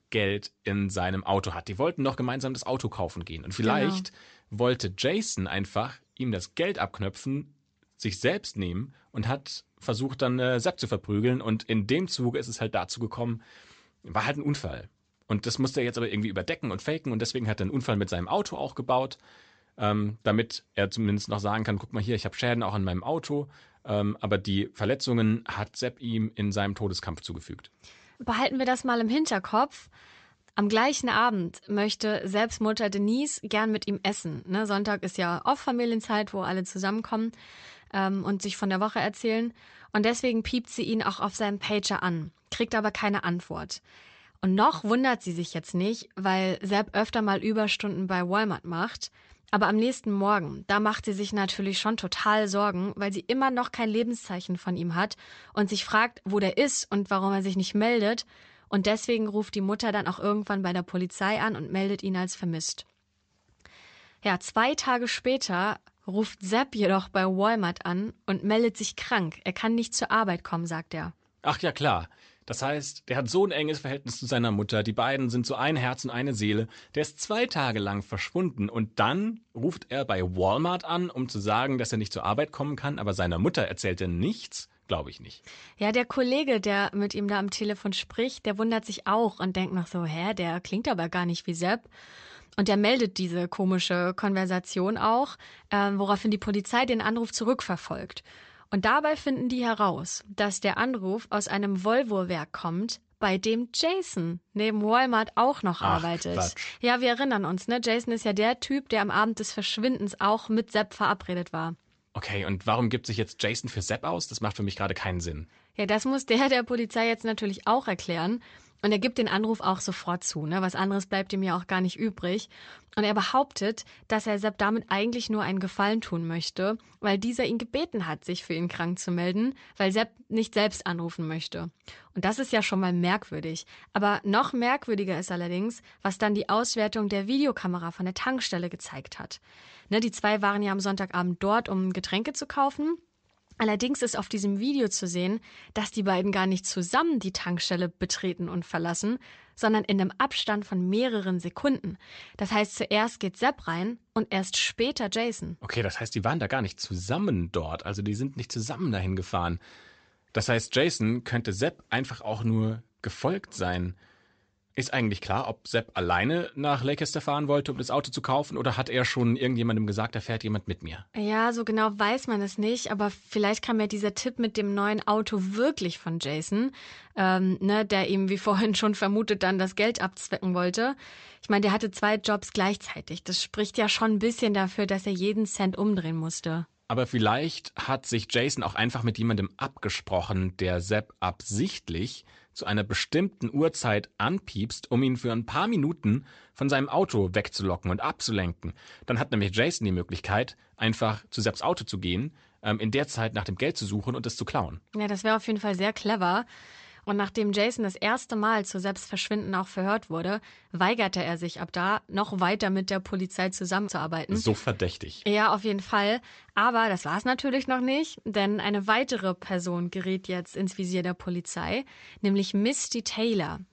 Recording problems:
high frequencies cut off; noticeable; nothing above 8 kHz

